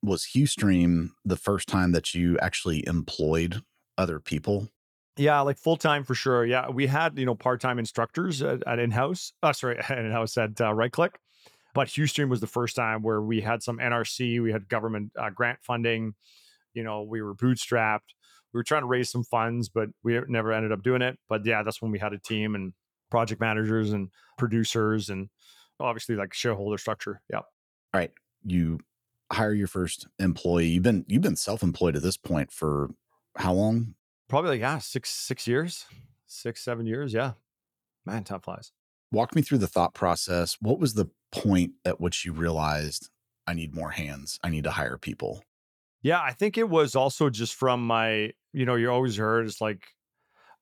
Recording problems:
none

